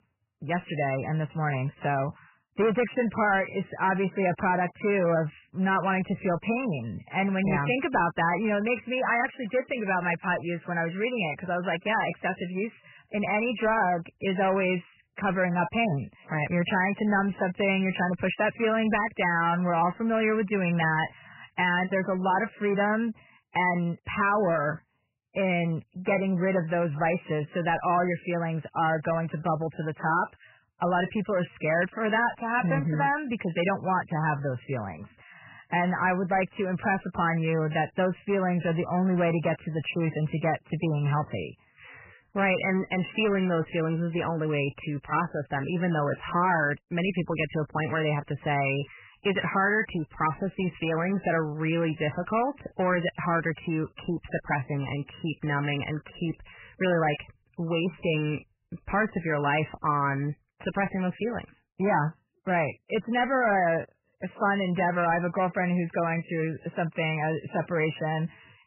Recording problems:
garbled, watery; badly; nothing above 3 kHz
distortion; slight; 10 dB below the speech

